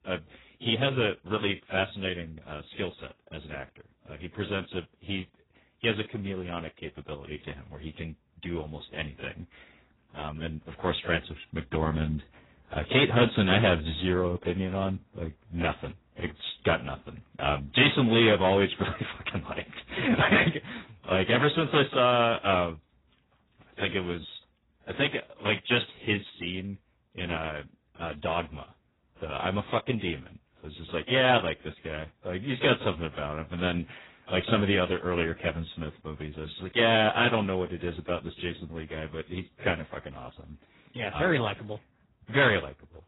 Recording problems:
distortion; heavy; 3% of the sound clipped
garbled, watery; badly; nothing above 4 kHz

